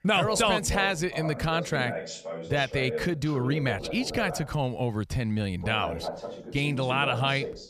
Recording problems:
voice in the background; loud; throughout; 9 dB below the speech

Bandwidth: 14.5 kHz